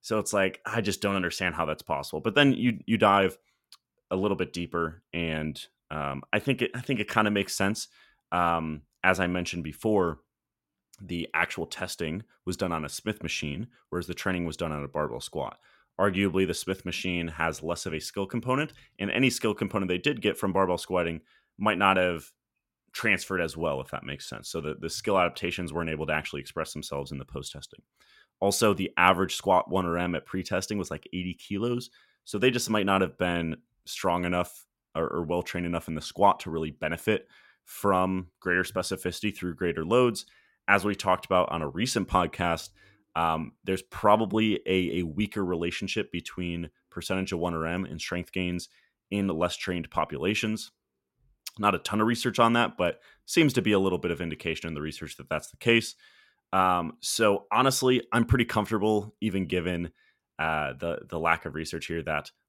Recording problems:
none

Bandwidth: 16.5 kHz